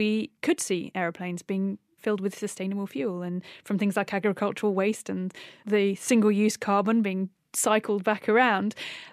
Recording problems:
abrupt cut into speech; at the start

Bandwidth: 14.5 kHz